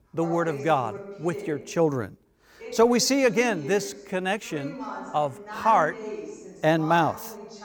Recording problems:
voice in the background; noticeable; throughout; 15 dB below the speech

